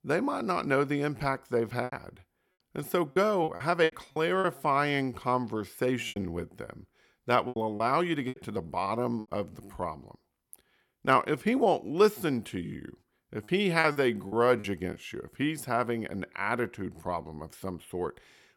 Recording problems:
choppy; very; from 2 to 4.5 s, from 6 to 9.5 s and from 13 to 15 s; 10% of the speech affected

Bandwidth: 17.5 kHz